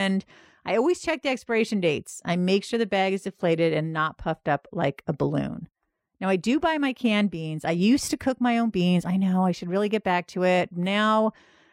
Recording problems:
abrupt cut into speech; at the start

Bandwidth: 16 kHz